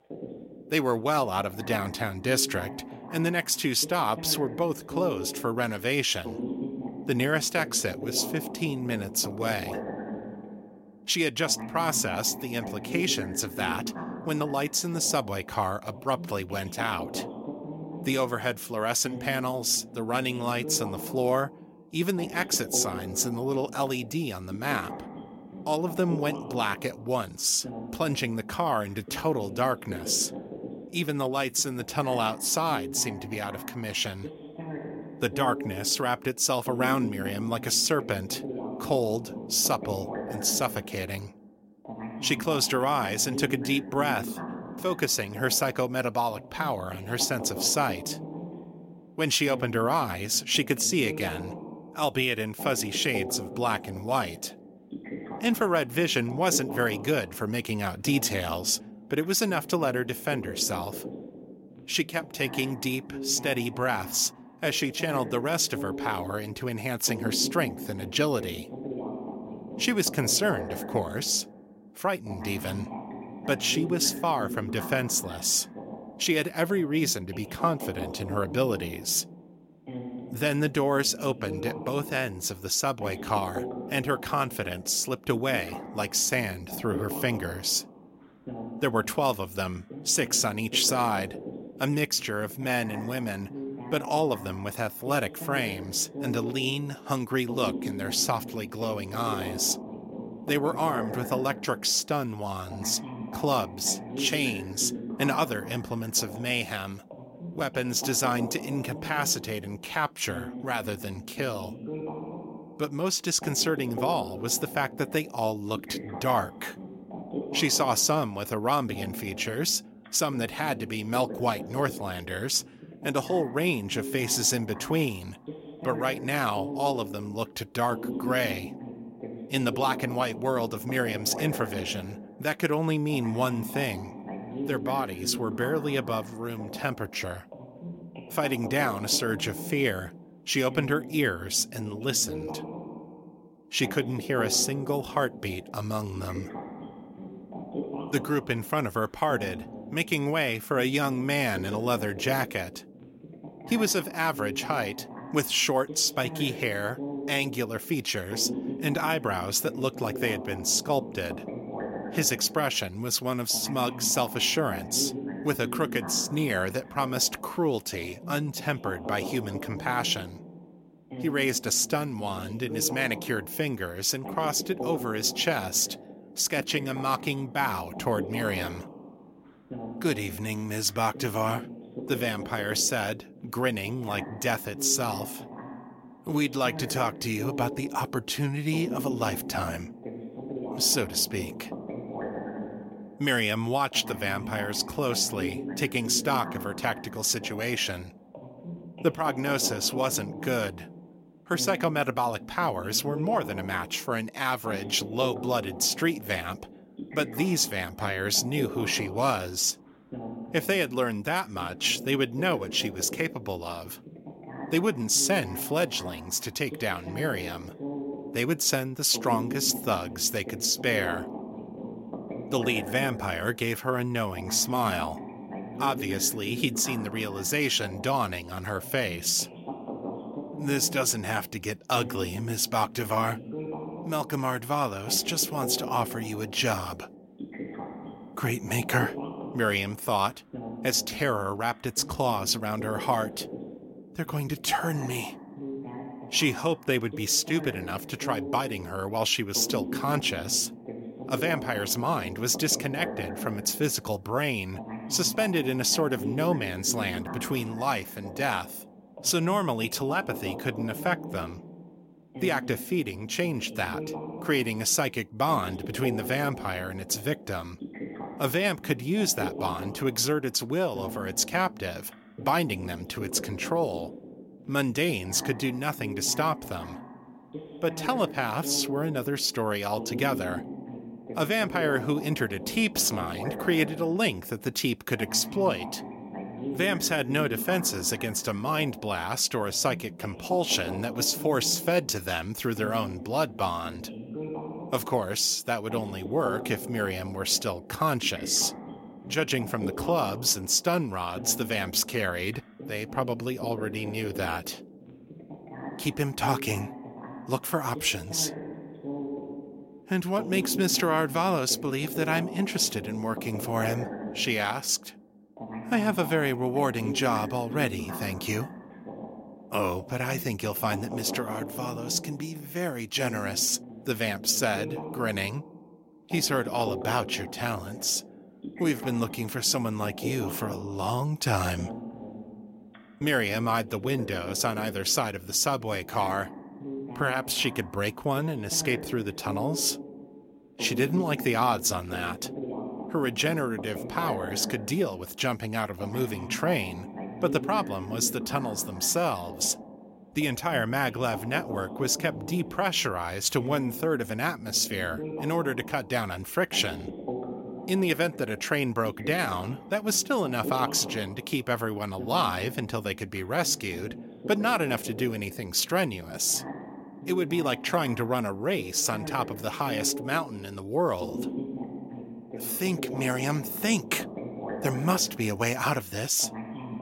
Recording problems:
voice in the background; noticeable; throughout; 10 dB below the speech

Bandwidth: 16.5 kHz